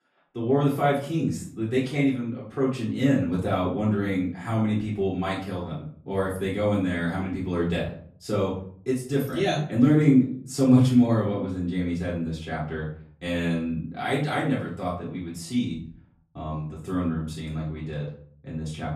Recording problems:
off-mic speech; far
room echo; slight; dies away in 0.5 s

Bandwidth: 13.5 kHz